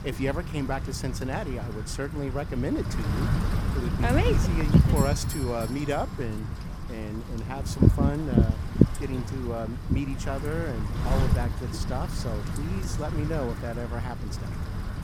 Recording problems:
wind noise on the microphone; heavy; 3 dB below the speech
doorbell; noticeable; from 5 to 6 s; peak 4 dB below the speech

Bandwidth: 17 kHz